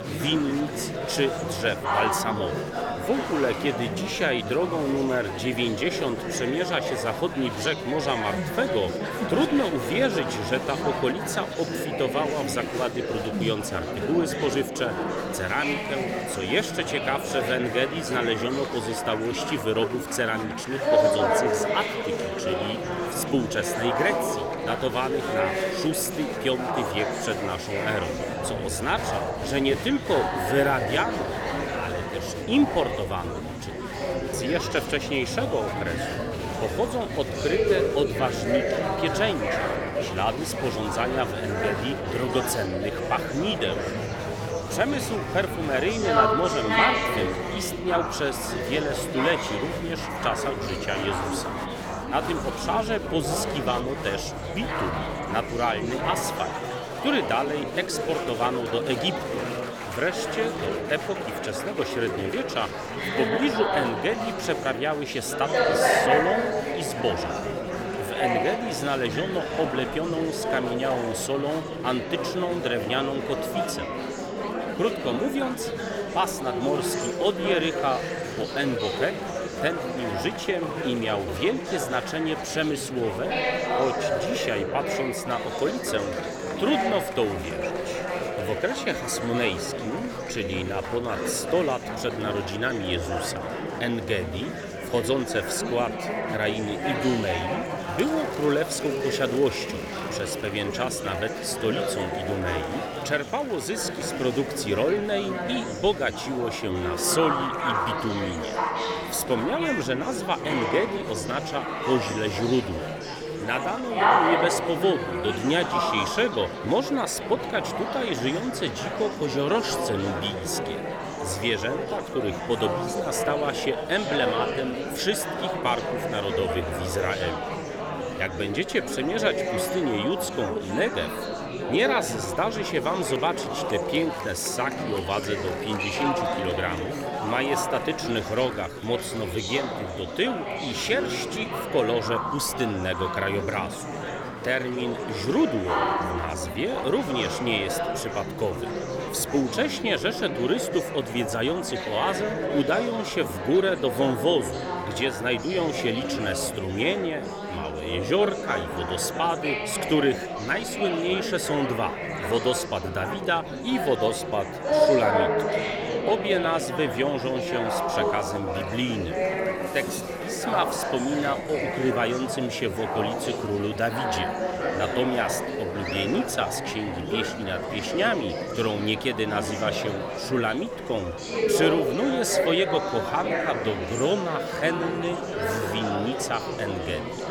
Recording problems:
murmuring crowd; loud; throughout; 1 dB below the speech

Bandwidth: 18.5 kHz